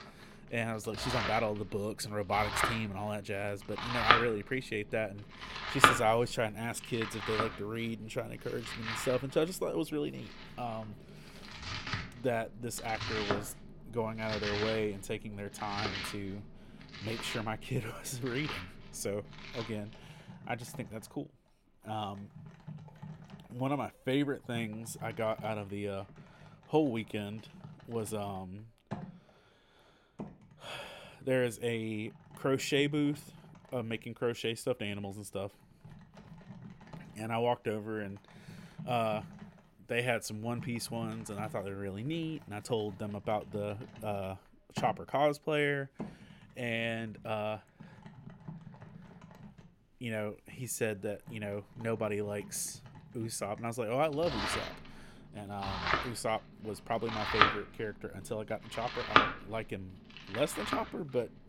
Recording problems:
household noises; very loud; throughout; 1 dB above the speech

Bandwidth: 16.5 kHz